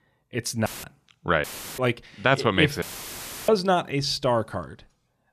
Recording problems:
audio cutting out; filled with static; at 0.5 s, at 1.5 s and at 3 s for 0.5 s

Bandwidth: 14.5 kHz